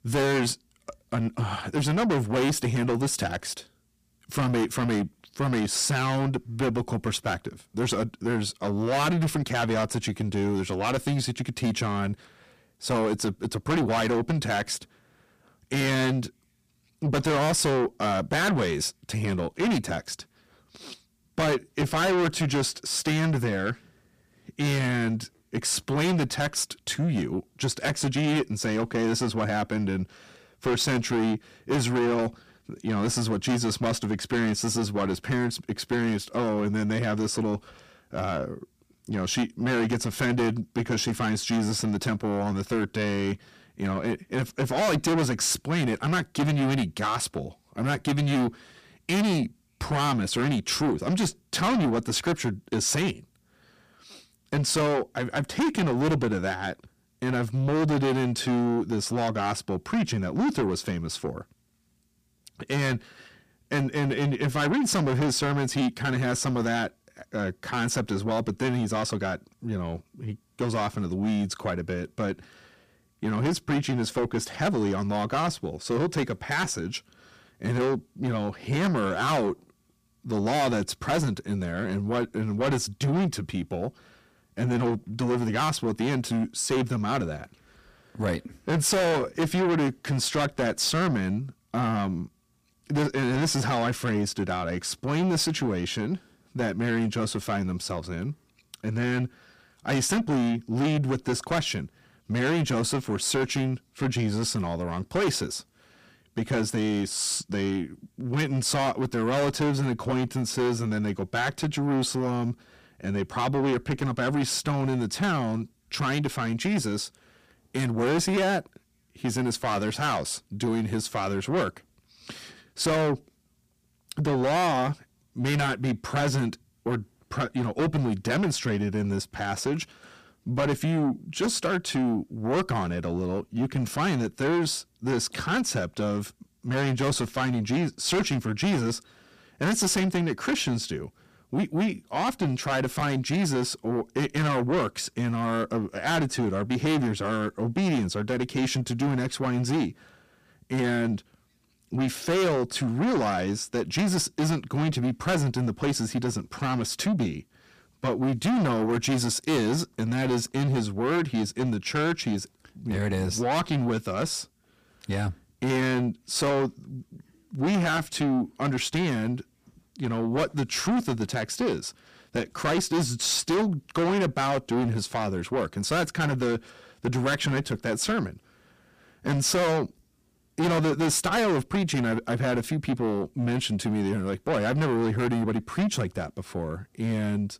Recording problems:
distortion; heavy; 5 dB below the speech

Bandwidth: 15 kHz